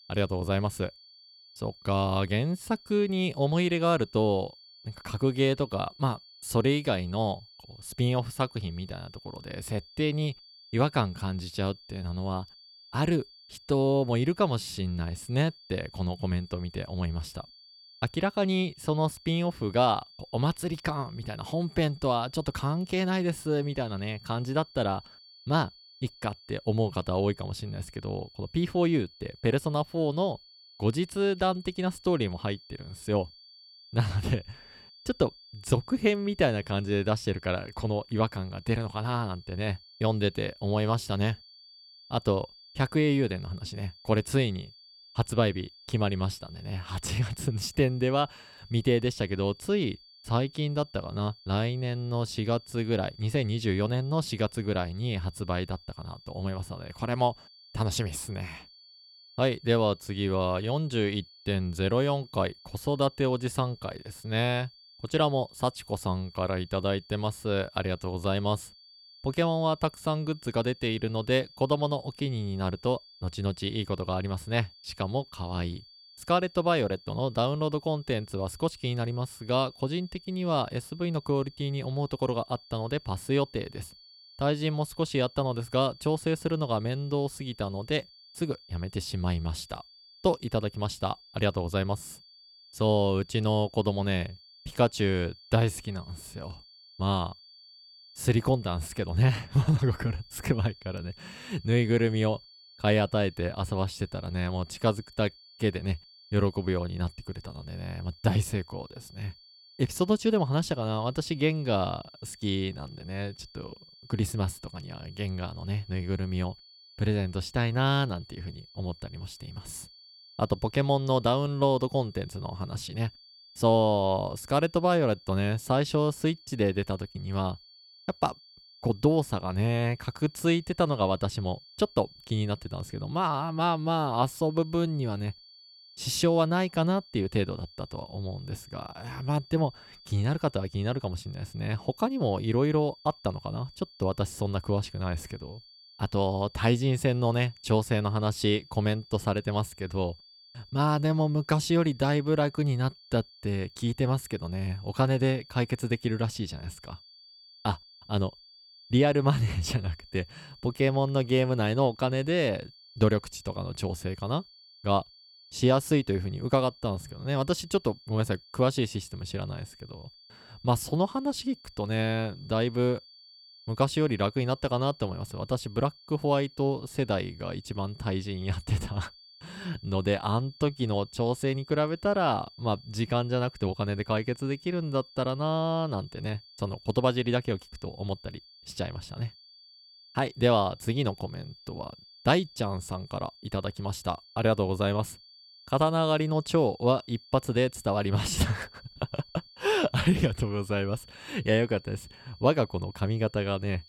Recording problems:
high-pitched whine; faint; throughout; 4.5 kHz, 20 dB below the speech

